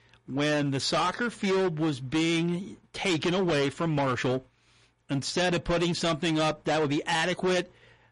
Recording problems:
distortion; heavy; 20% of the sound clipped
garbled, watery; slightly; nothing above 10.5 kHz

